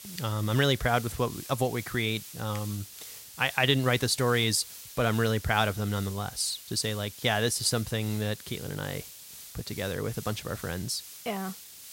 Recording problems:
hiss; noticeable; throughout; 15 dB below the speech

